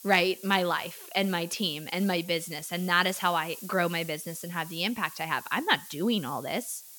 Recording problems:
hiss; noticeable; throughout; 15 dB below the speech

